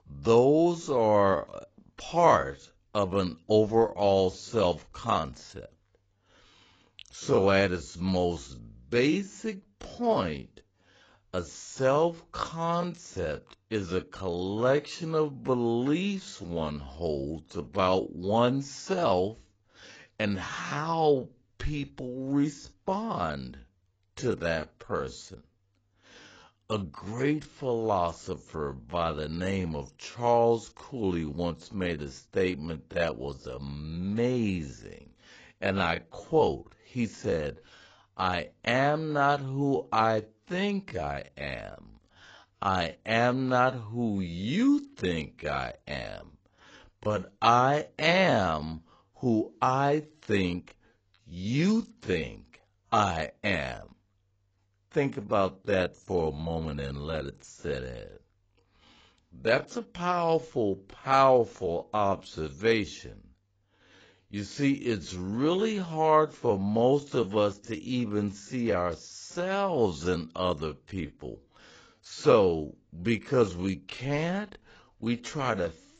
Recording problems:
garbled, watery; badly; nothing above 7.5 kHz
wrong speed, natural pitch; too slow; 0.6 times normal speed

